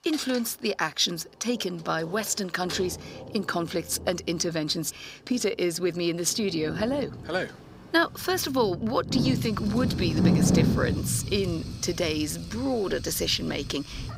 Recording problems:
thin; very slightly; fading below 550 Hz
rain or running water; loud; throughout; 2 dB below the speech
household noises; noticeable; throughout; 15 dB below the speech

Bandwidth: 15.5 kHz